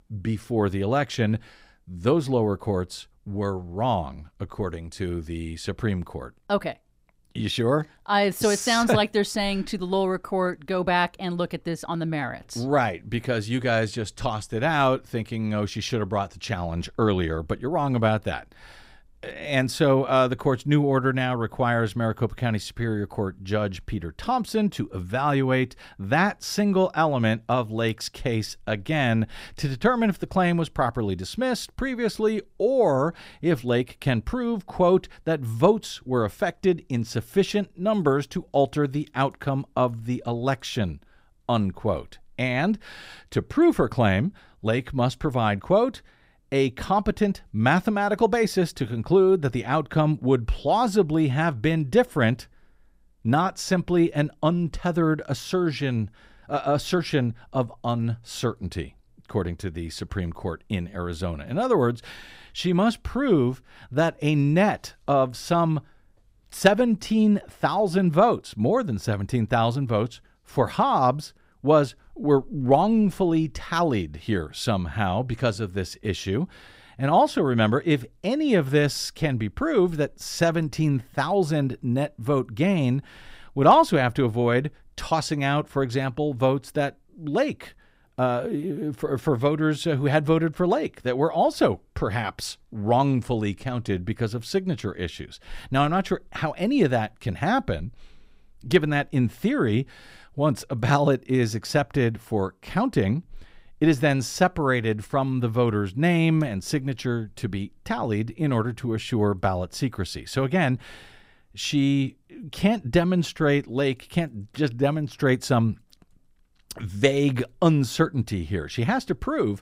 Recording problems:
none

